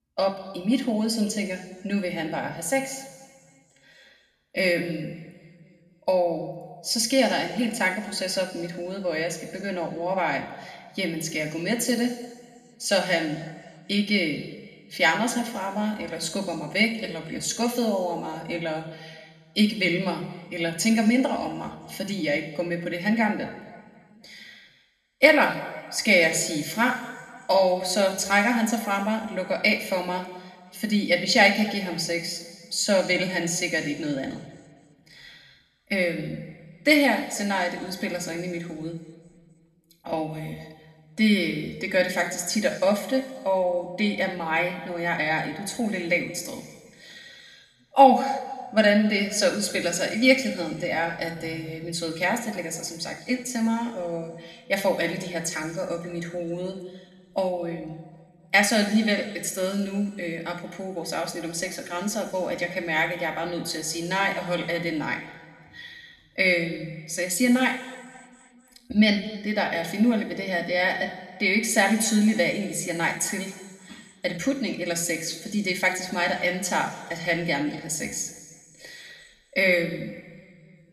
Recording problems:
room echo; slight; dies away in 1.6 s
off-mic speech; somewhat distant

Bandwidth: 13.5 kHz